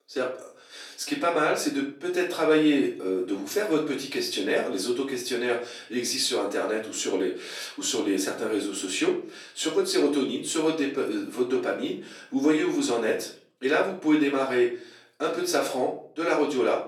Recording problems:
off-mic speech; far
room echo; slight; dies away in 0.4 s
thin; very slightly; fading below 300 Hz

